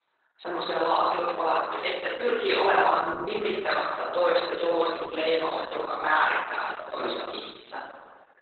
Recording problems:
off-mic speech; far
garbled, watery; badly; nothing above 4 kHz
thin; very; fading below 350 Hz
room echo; noticeable; dies away in 1 s

